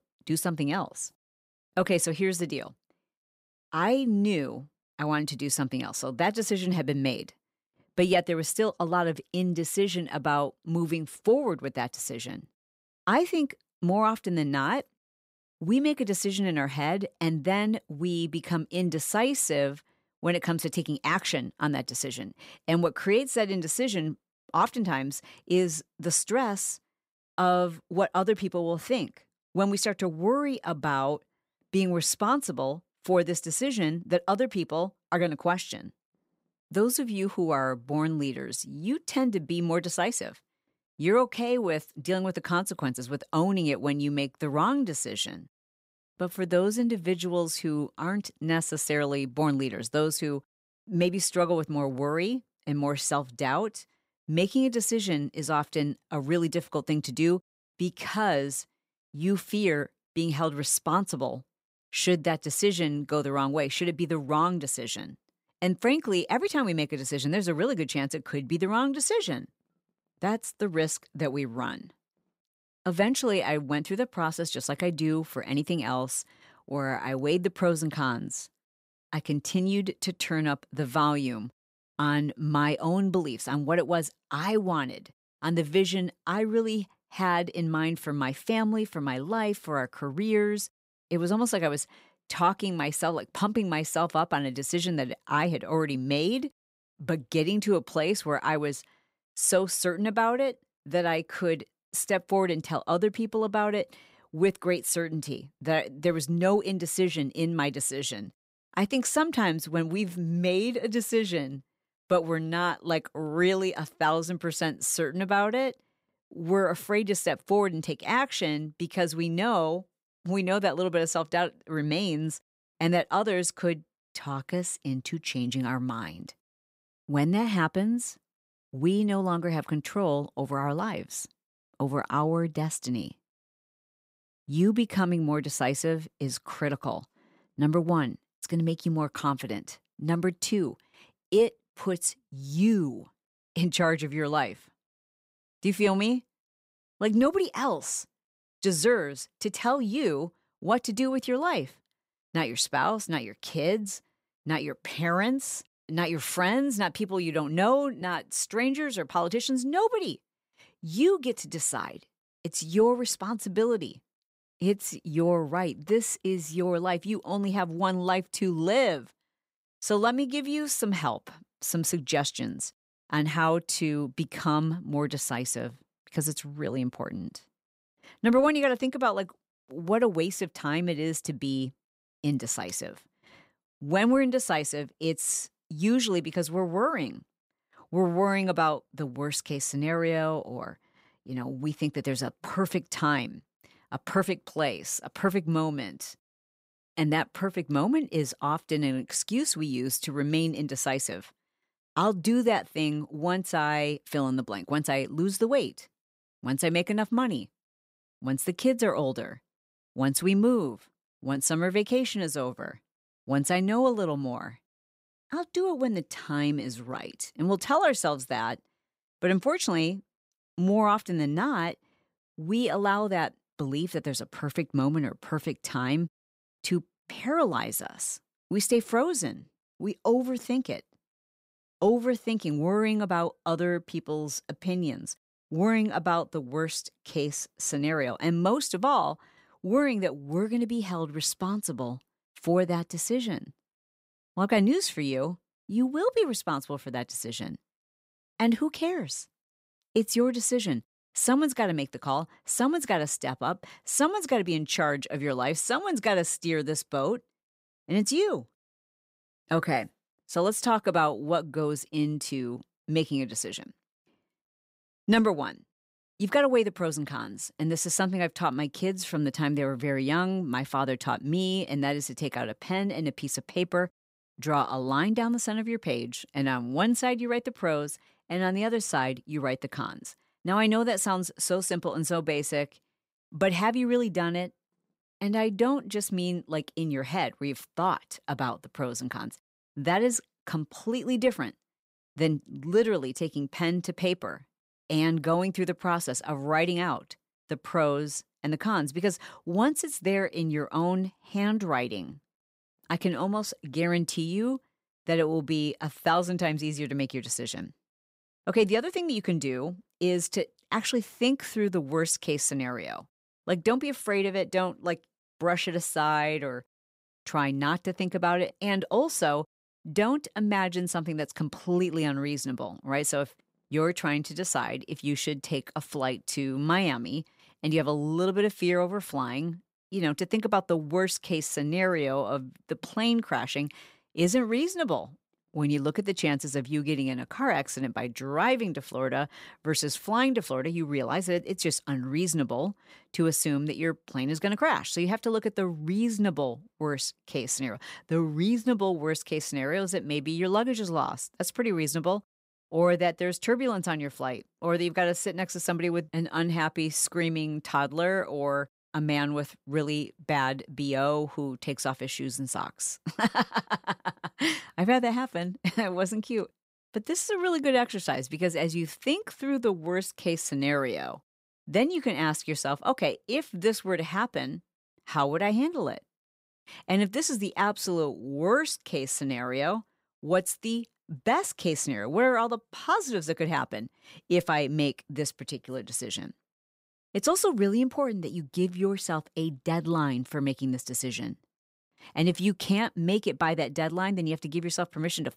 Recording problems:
none

